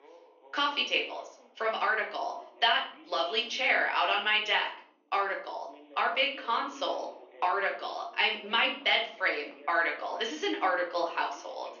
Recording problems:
off-mic speech; far
thin; somewhat; fading below 300 Hz
room echo; slight; dies away in 0.4 s
garbled, watery; slightly; nothing above 6.5 kHz
voice in the background; faint; throughout; 25 dB below the speech

